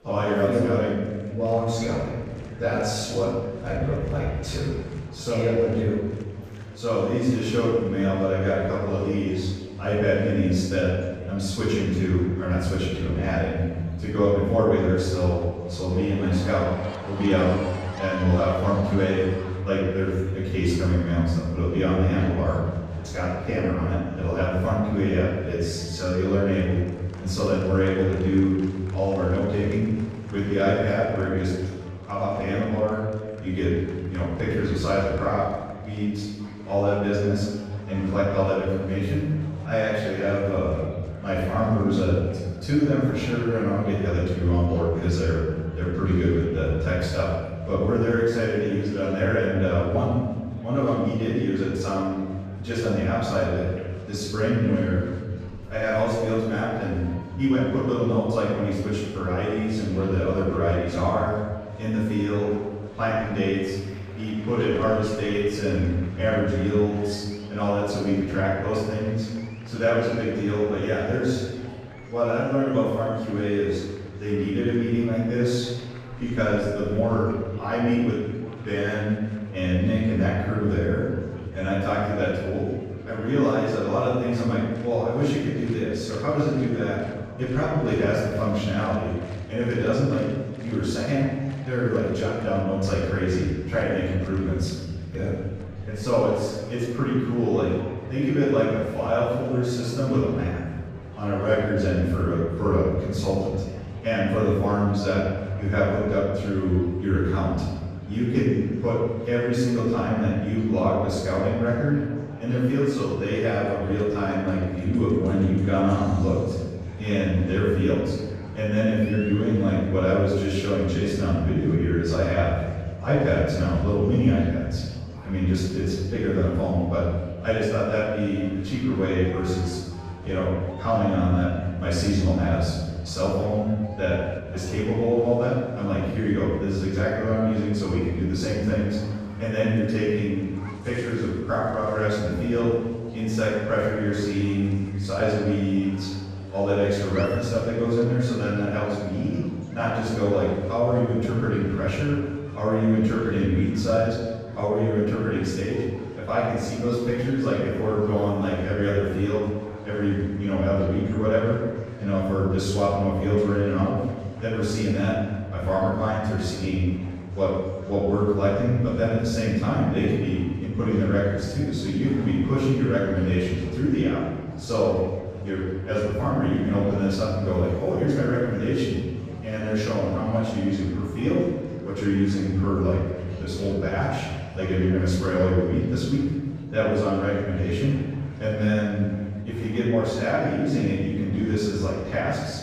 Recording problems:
room echo; strong; dies away in 1.5 s
off-mic speech; far
murmuring crowd; faint; throughout; 20 dB below the speech

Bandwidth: 15.5 kHz